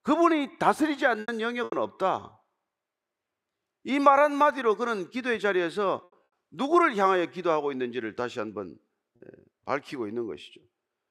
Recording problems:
choppy; occasionally; 2% of the speech affected

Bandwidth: 15.5 kHz